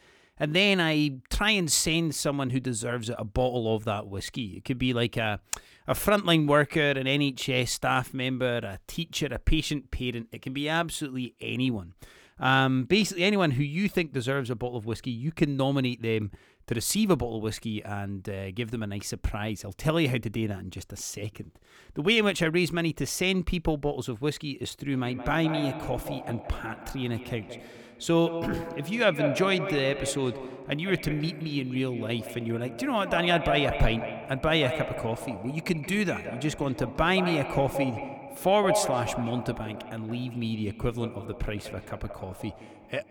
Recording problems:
echo of what is said; strong; from 25 s on; 170 ms later, 8 dB below the speech

